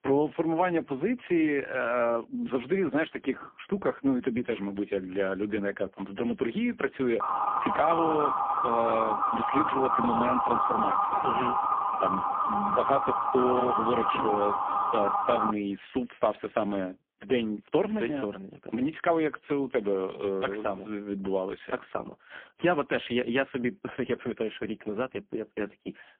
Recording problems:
phone-call audio; poor line; nothing above 3 kHz
siren; loud; from 7 to 16 s; peak 4 dB above the speech

